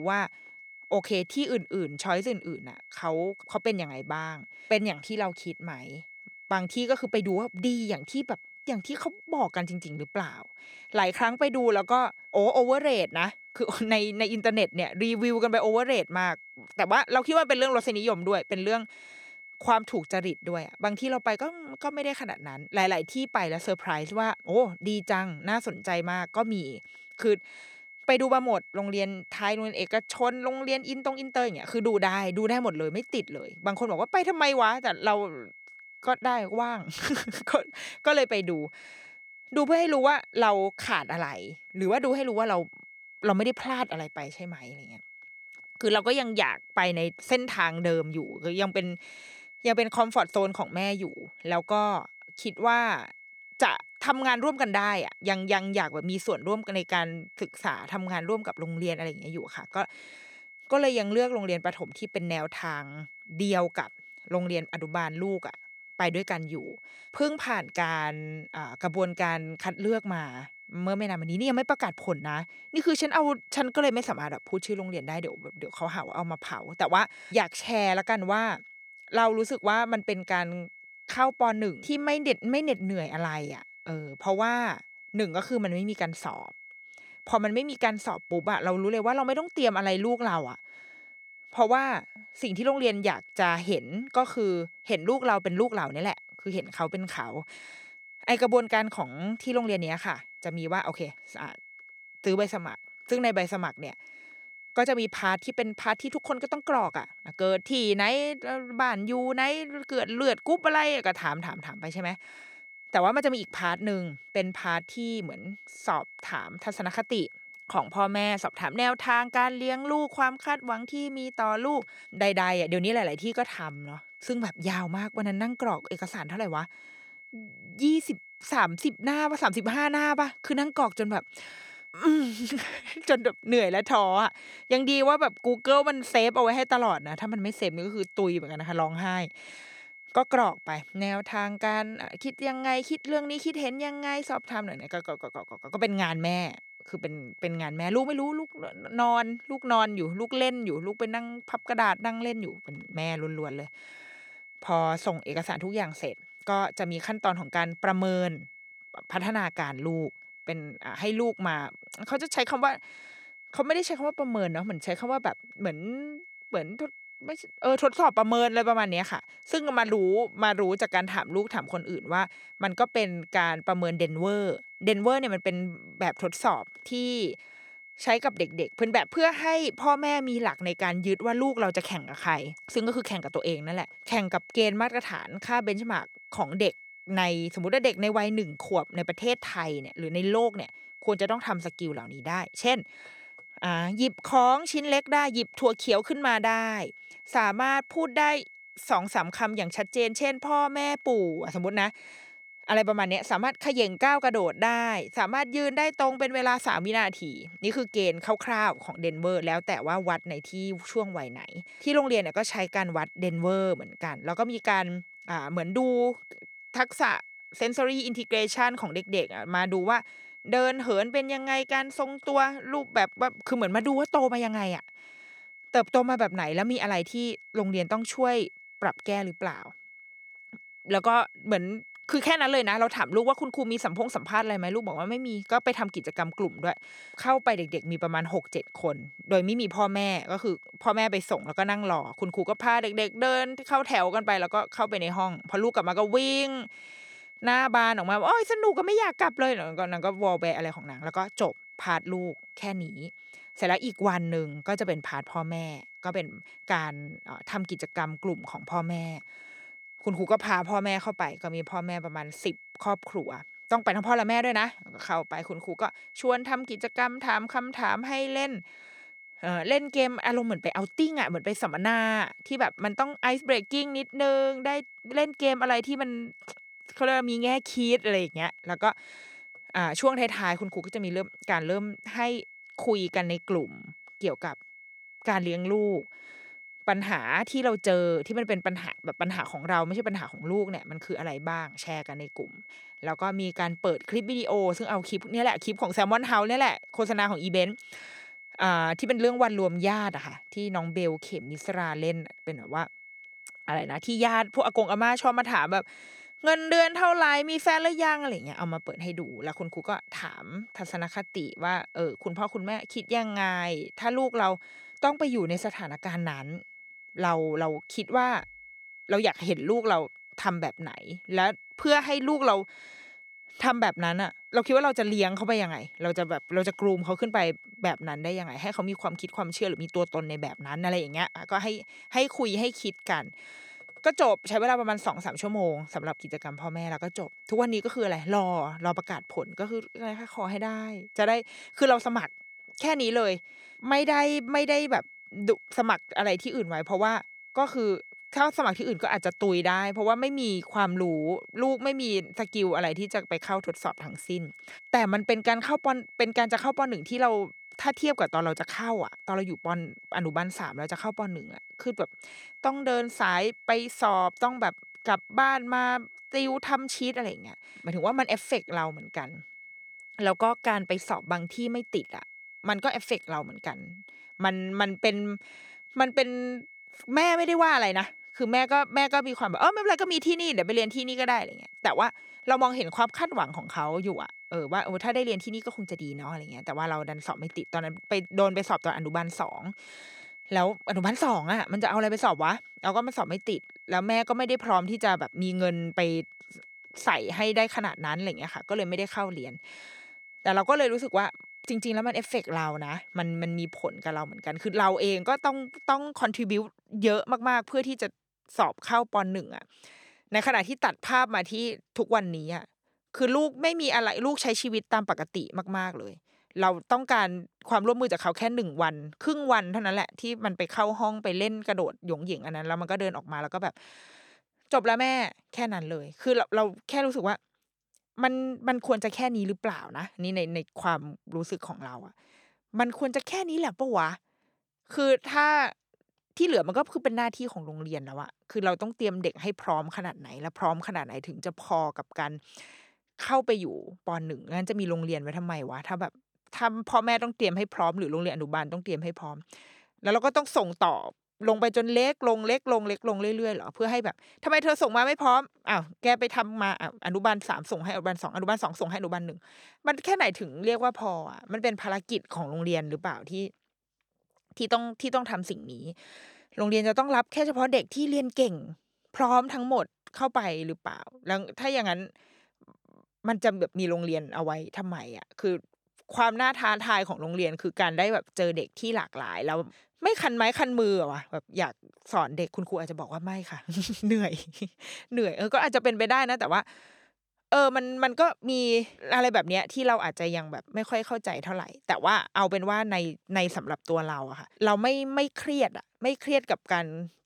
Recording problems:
high-pitched whine; noticeable; until 6:46; 2 kHz, 20 dB below the speech
abrupt cut into speech; at the start

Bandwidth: 18.5 kHz